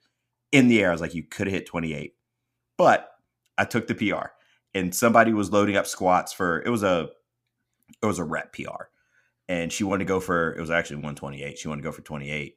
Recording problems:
none

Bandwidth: 15.5 kHz